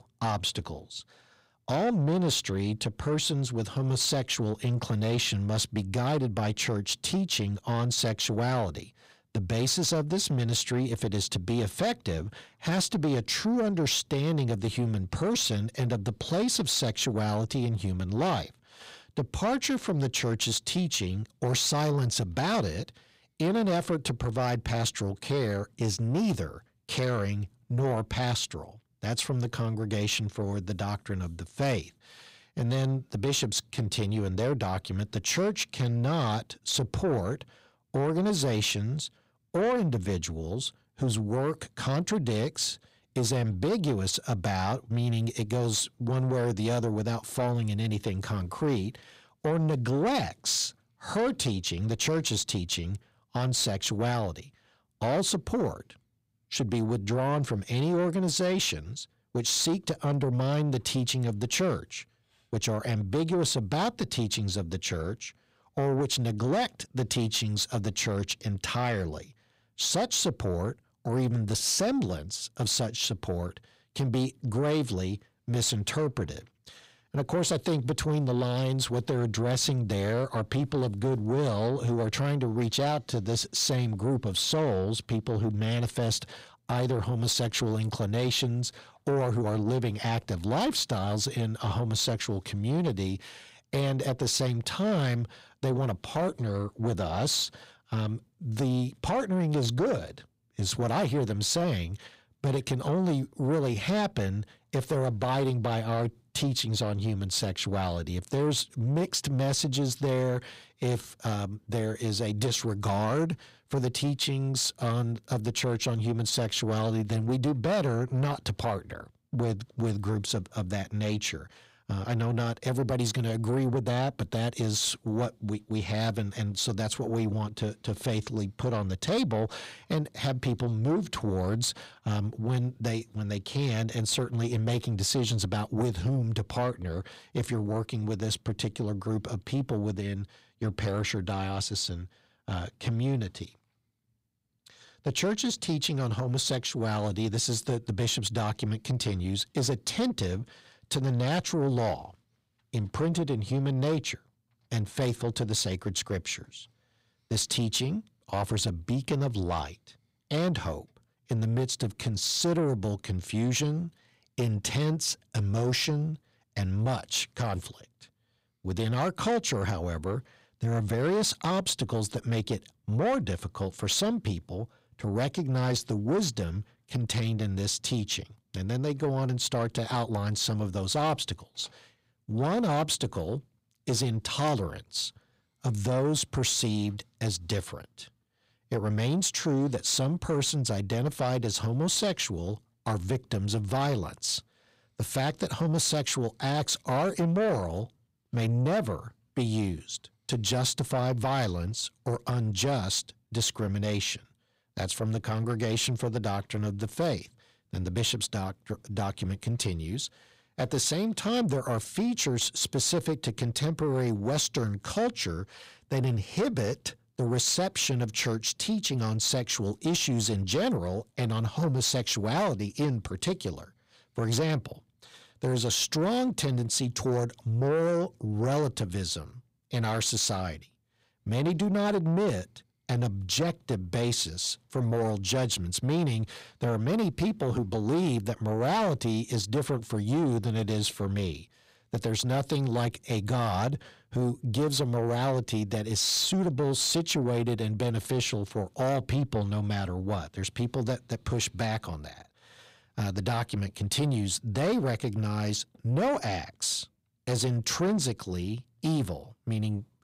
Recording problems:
distortion; slight; 10 dB below the speech

